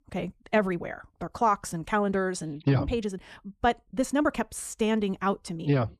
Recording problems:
wrong speed, natural pitch; too fast; 1.5 times normal speed

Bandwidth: 14 kHz